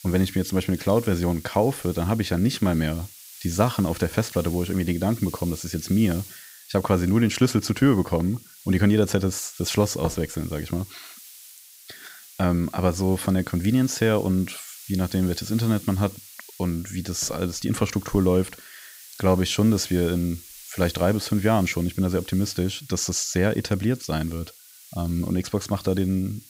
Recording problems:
hiss; noticeable; throughout; 20 dB below the speech

